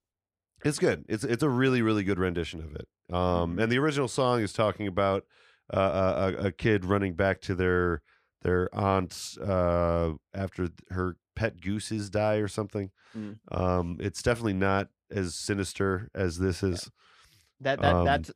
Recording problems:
none

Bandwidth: 14.5 kHz